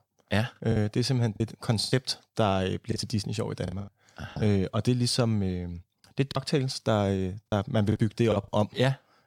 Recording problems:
choppy; very; 8% of the speech affected

